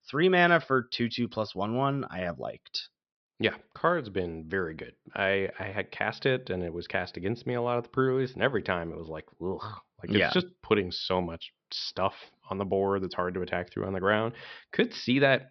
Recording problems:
high frequencies cut off; noticeable; nothing above 5.5 kHz

